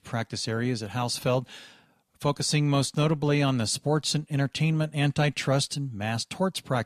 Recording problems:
none

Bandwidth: 14.5 kHz